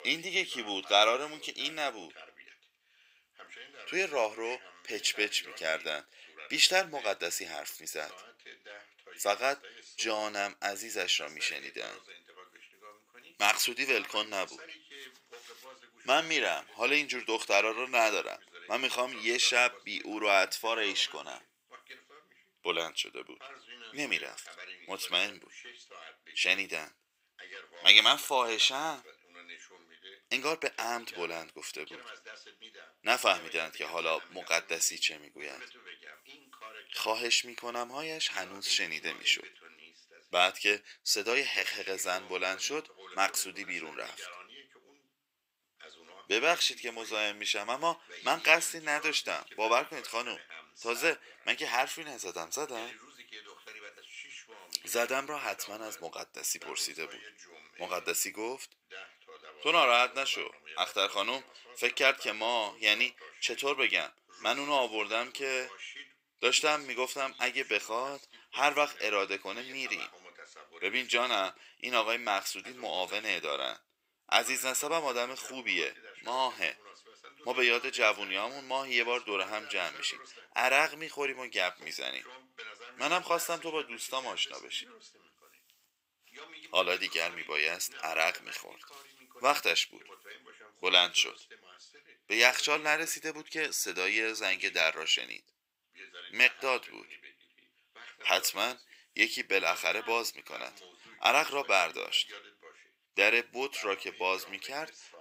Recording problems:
thin; very; fading below 850 Hz
voice in the background; faint; throughout; 20 dB below the speech

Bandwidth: 15.5 kHz